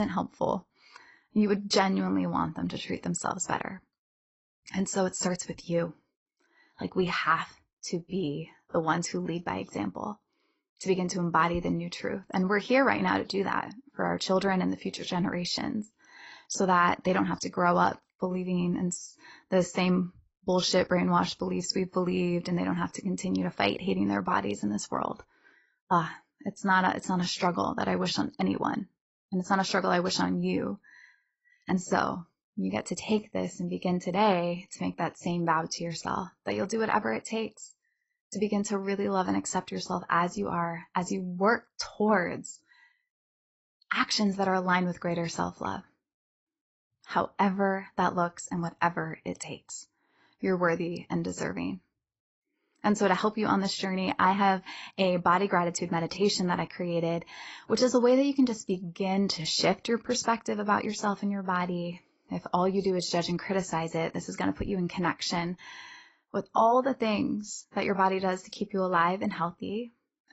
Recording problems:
garbled, watery; badly; nothing above 8 kHz
abrupt cut into speech; at the start

